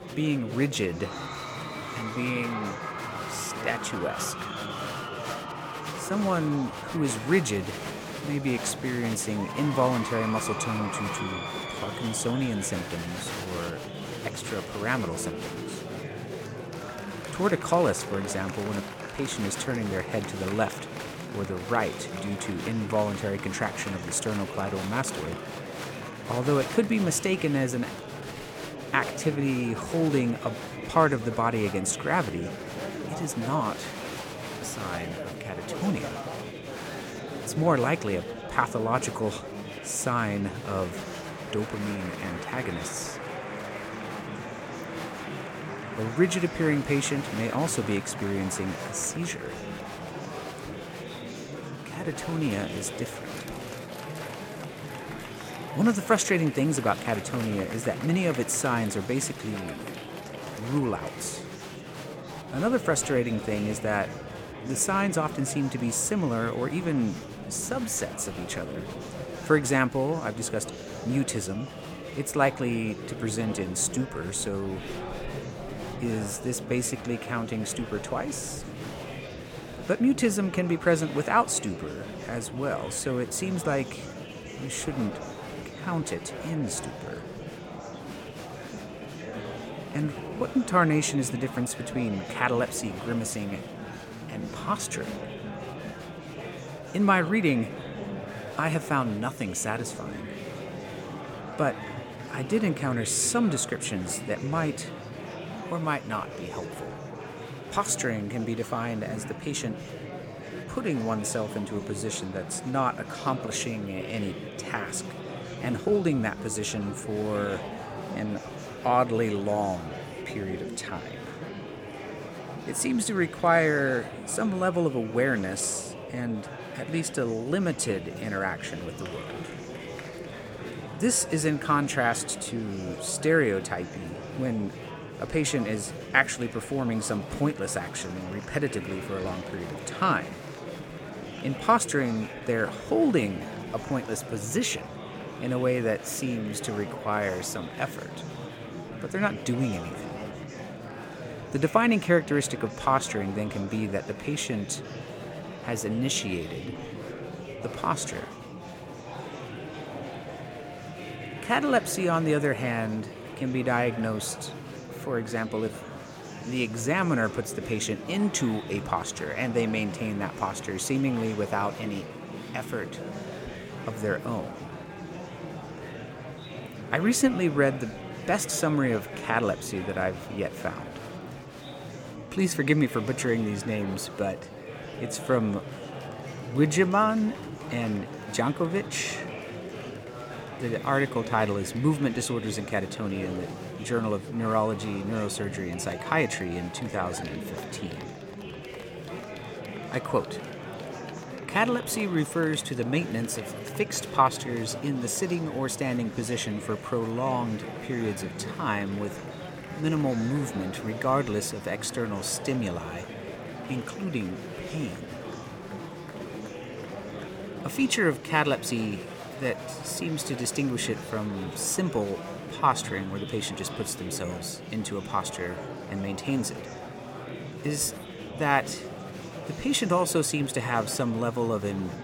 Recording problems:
murmuring crowd; loud; throughout; 9 dB below the speech

